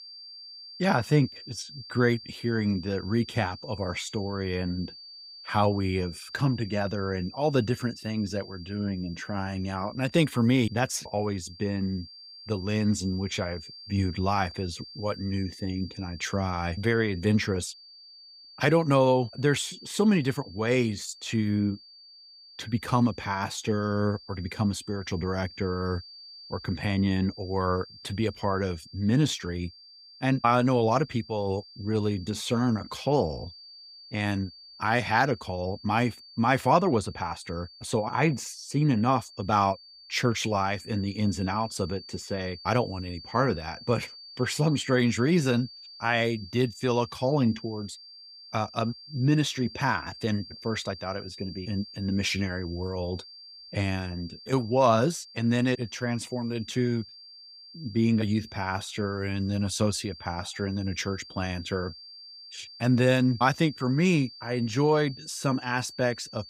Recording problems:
high-pitched whine; noticeable; throughout; 4.5 kHz, 15 dB below the speech

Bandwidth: 15.5 kHz